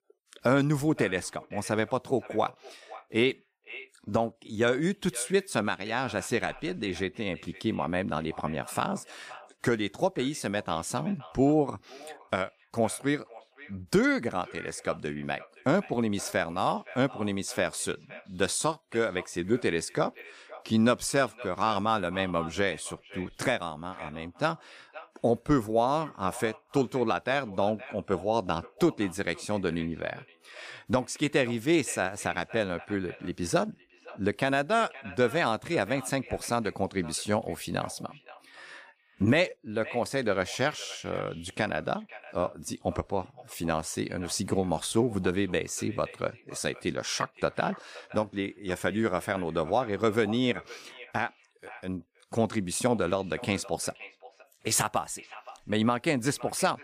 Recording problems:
echo of what is said; faint; throughout; 520 ms later, 20 dB below the speech

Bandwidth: 15 kHz